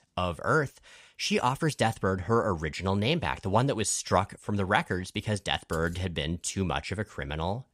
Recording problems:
none

